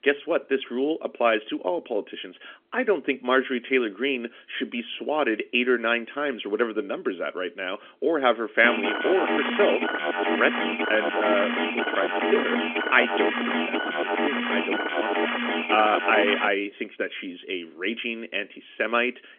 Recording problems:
phone-call audio; nothing above 3.5 kHz
alarm; loud; from 8.5 to 16 s; peak 1 dB above the speech

